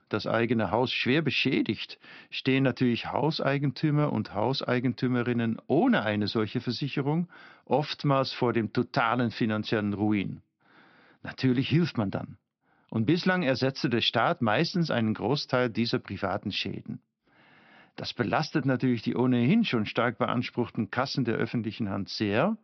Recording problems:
high frequencies cut off; noticeable; nothing above 5.5 kHz

